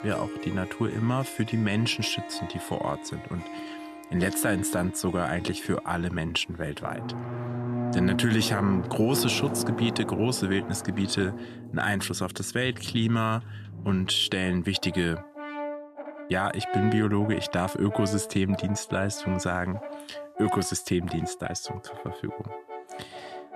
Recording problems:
background music; loud; throughout; 8 dB below the speech

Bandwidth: 14 kHz